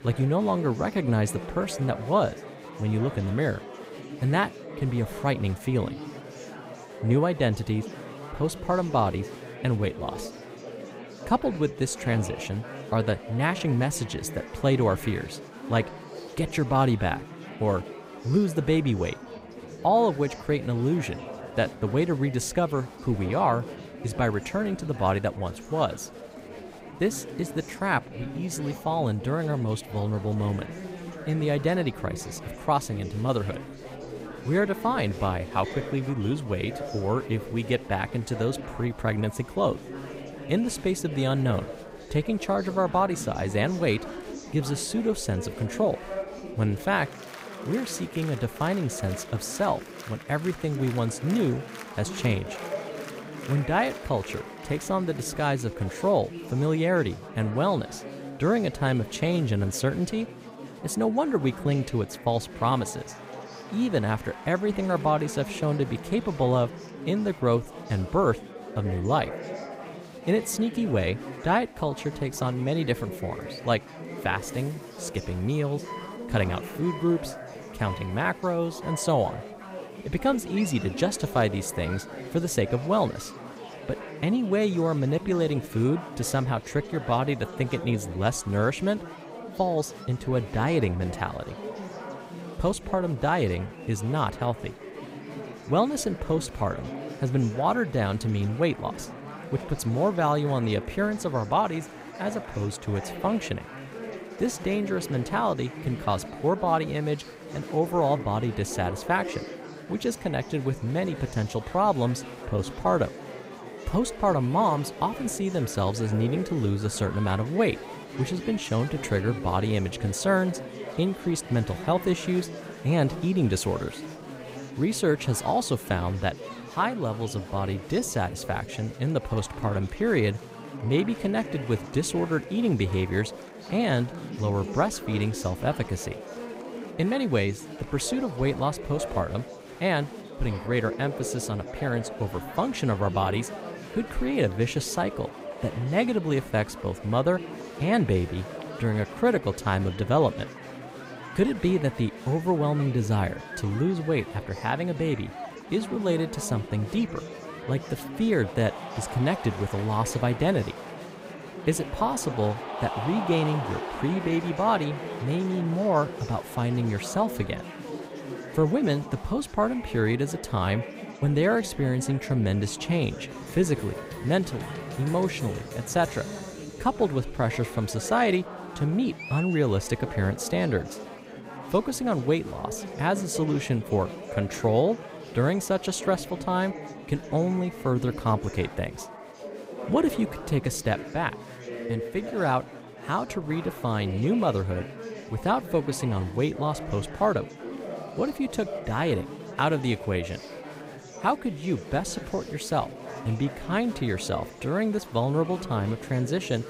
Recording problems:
chatter from many people; noticeable; throughout; 10 dB below the speech

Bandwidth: 15.5 kHz